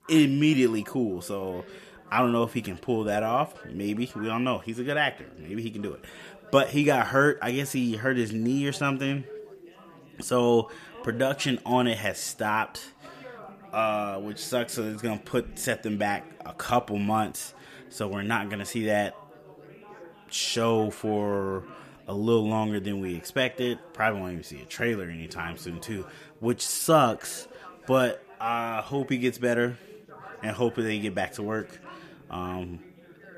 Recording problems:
background chatter; faint; throughout; 4 voices, 20 dB below the speech

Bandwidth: 14.5 kHz